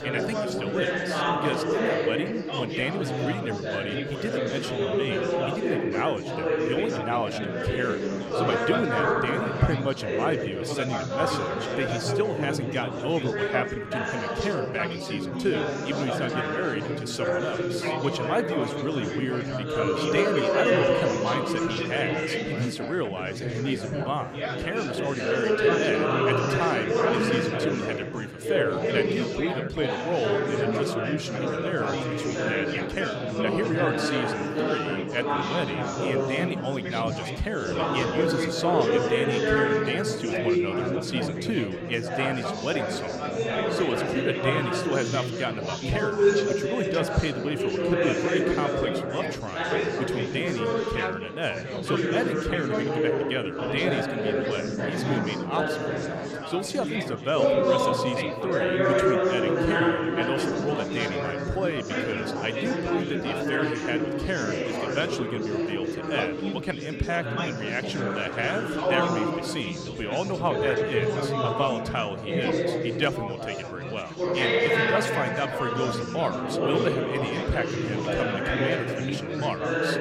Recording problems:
chatter from many people; very loud; throughout; 4 dB above the speech

